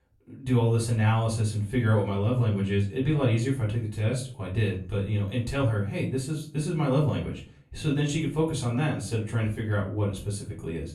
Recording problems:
off-mic speech; far
room echo; slight; dies away in 0.3 s

